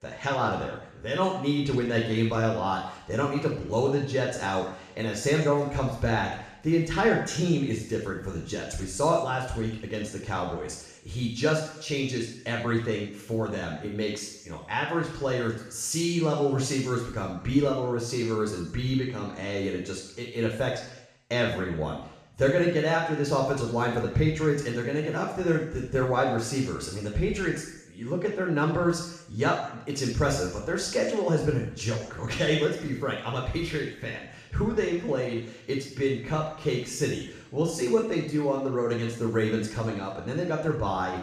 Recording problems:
off-mic speech; far
room echo; noticeable; dies away in 0.8 s

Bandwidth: 14.5 kHz